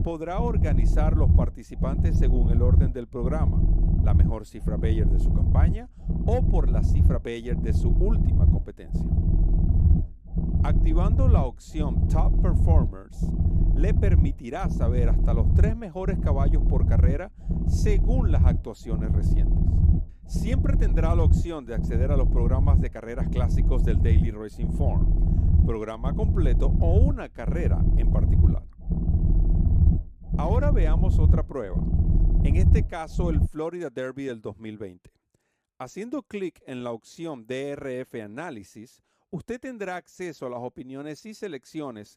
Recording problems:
low rumble; loud; until 33 s; 3 dB below the speech

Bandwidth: 15 kHz